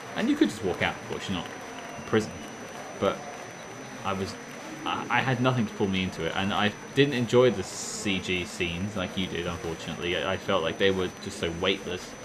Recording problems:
murmuring crowd; noticeable; throughout; 10 dB below the speech
high-pitched whine; faint; throughout; 6 kHz, 20 dB below the speech

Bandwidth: 14.5 kHz